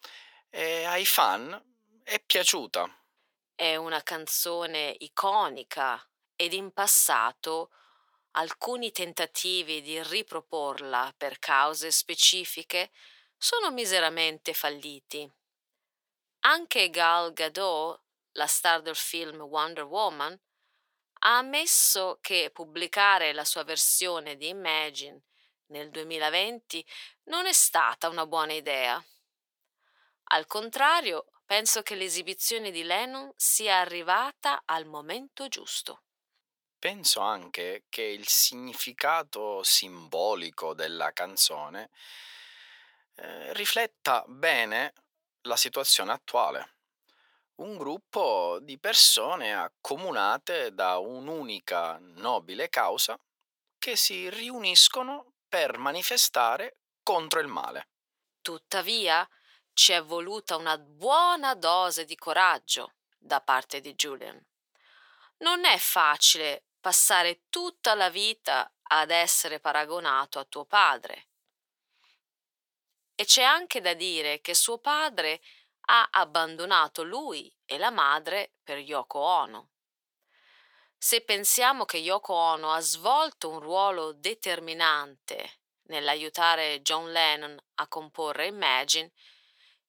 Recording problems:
thin; very; fading below 800 Hz

